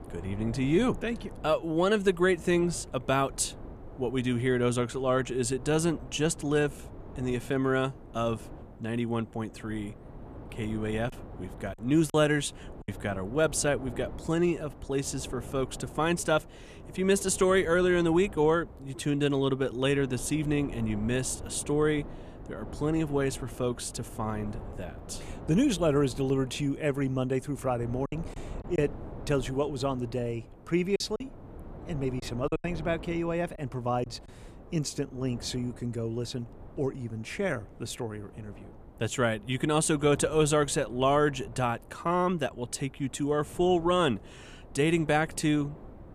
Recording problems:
wind noise on the microphone; occasional gusts; 20 dB below the speech
choppy; very; from 11 to 13 s, at 28 s and from 31 to 34 s; 7% of the speech affected

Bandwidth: 14.5 kHz